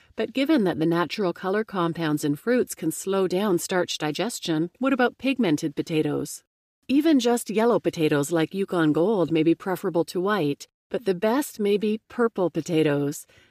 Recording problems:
none

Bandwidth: 15 kHz